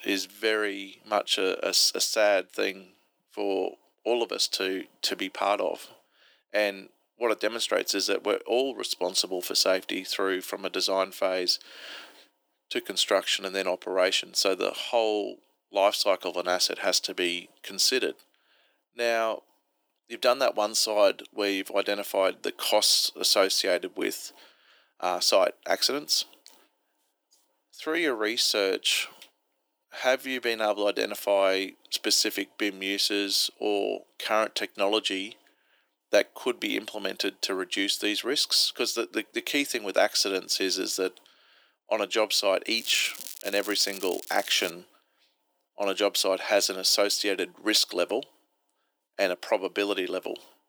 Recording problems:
thin; very; fading below 300 Hz
crackling; noticeable; from 43 to 45 s; 15 dB below the speech

